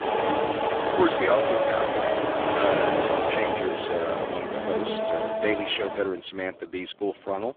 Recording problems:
phone-call audio; poor line; nothing above 3.5 kHz
traffic noise; very loud; throughout; 3 dB above the speech

